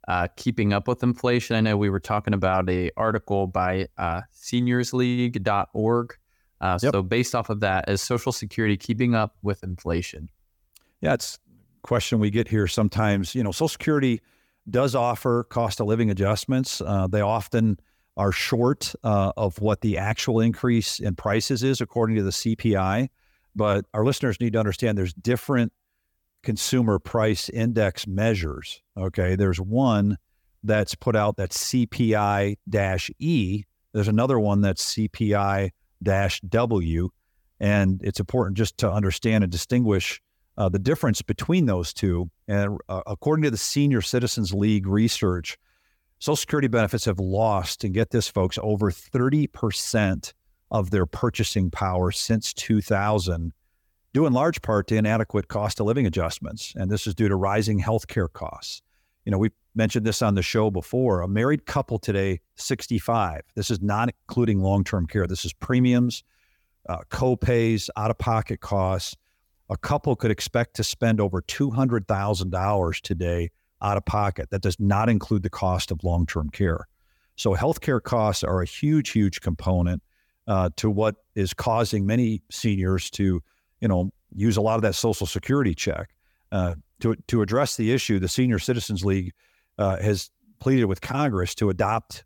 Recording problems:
none

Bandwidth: 18 kHz